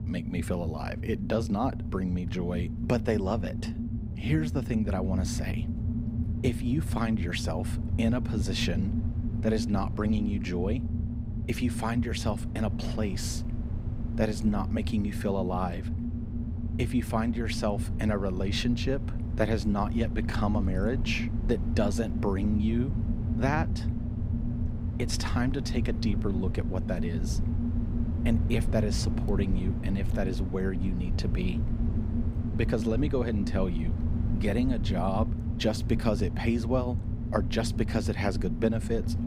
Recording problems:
low rumble; loud; throughout; 8 dB below the speech

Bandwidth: 15.5 kHz